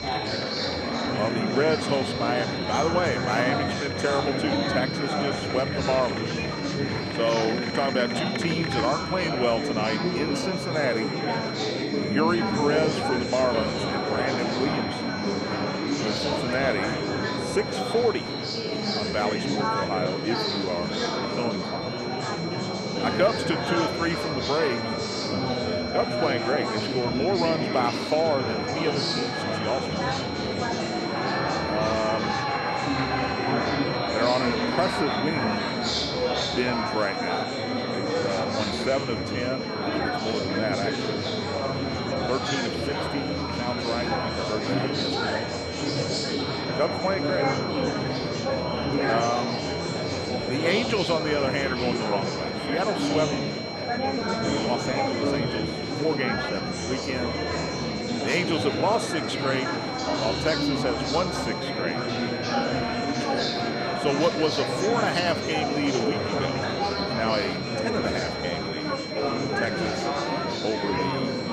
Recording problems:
murmuring crowd; very loud; throughout; 1 dB above the speech
high-pitched whine; loud; throughout; 4 kHz, 7 dB below the speech

